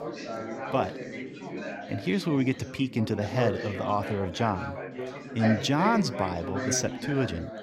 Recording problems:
chatter from many people; loud; throughout; 6 dB below the speech

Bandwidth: 16.5 kHz